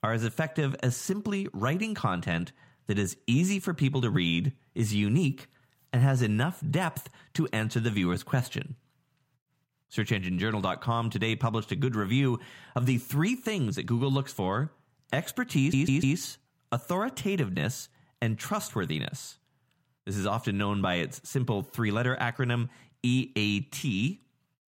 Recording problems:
audio stuttering; at 16 s

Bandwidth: 16 kHz